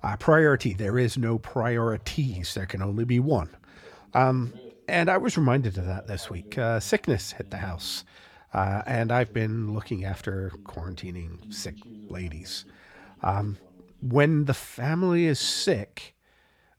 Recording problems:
voice in the background; faint; throughout; 25 dB below the speech

